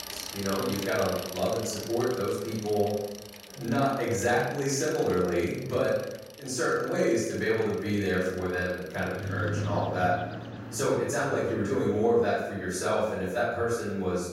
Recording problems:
off-mic speech; far
room echo; noticeable; dies away in 0.8 s
traffic noise; noticeable; throughout; 10 dB below the speech

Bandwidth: 16 kHz